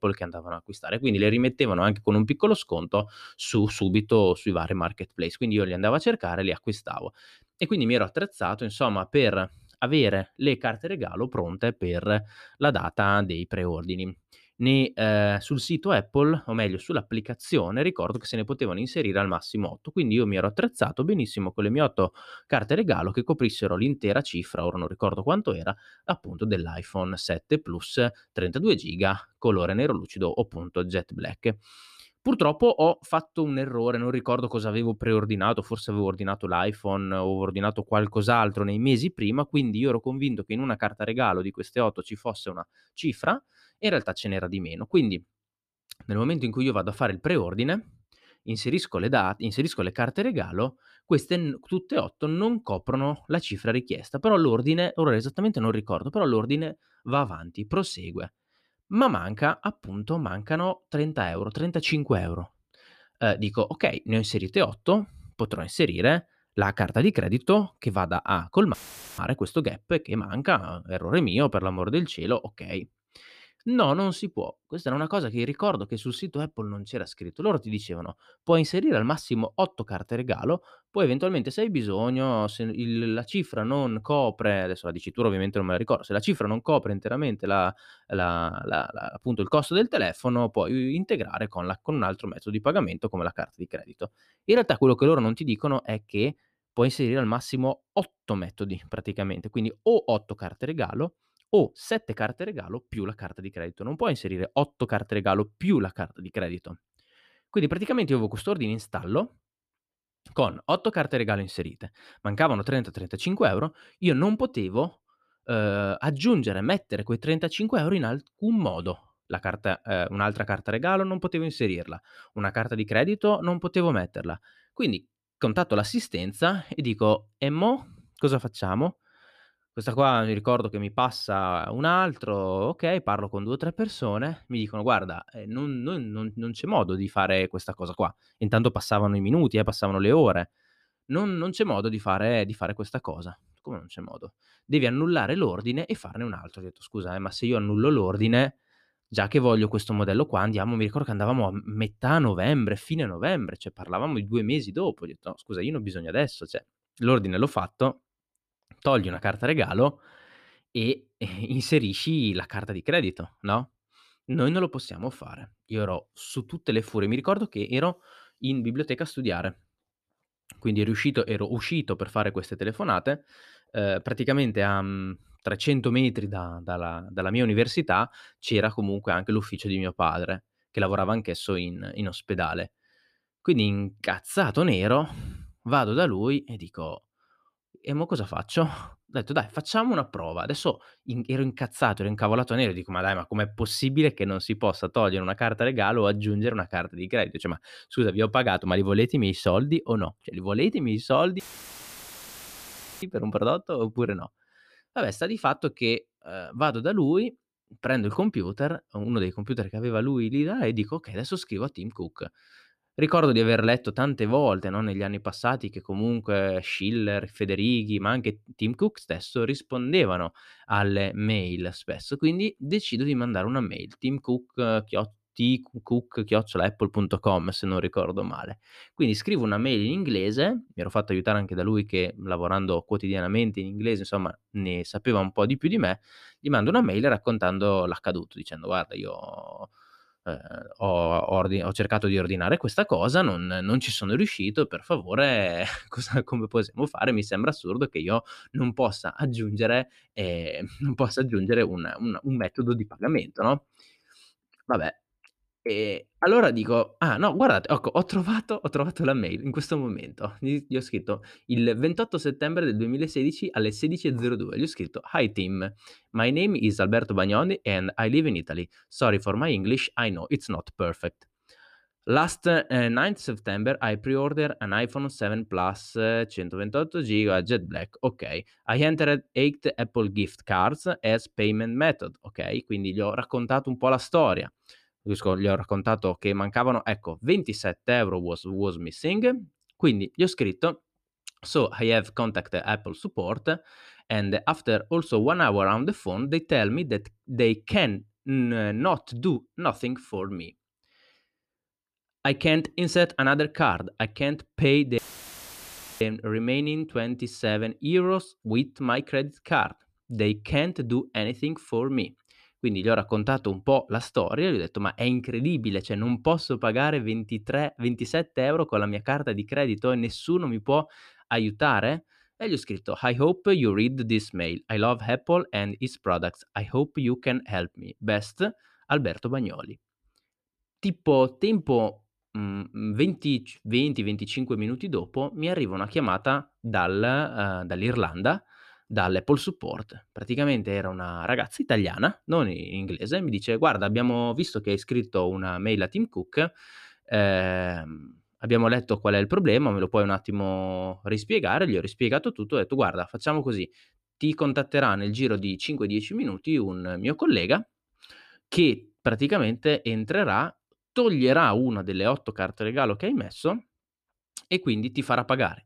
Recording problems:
audio cutting out; filled with static; at 1:09, at 3:21 for 1.5 s and at 5:05 for 1 s

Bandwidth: 14.5 kHz